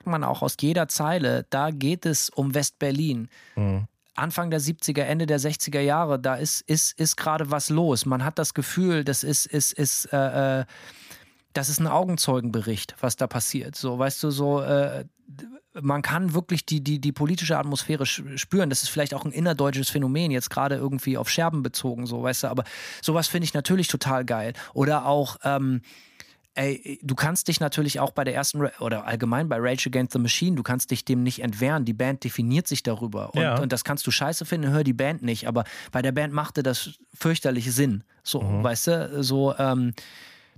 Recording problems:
none

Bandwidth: 15 kHz